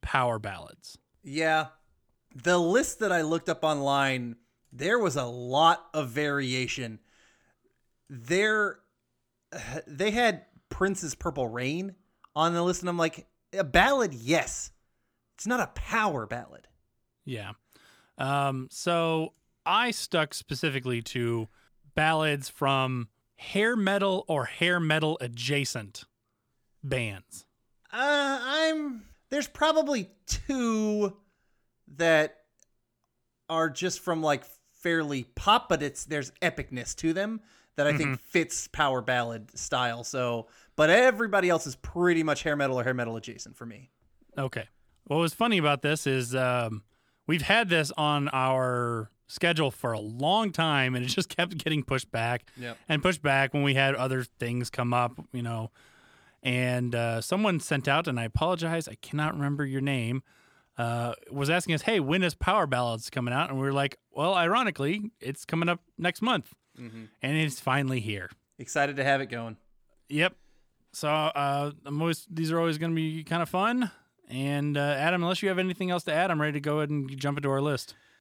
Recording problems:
none

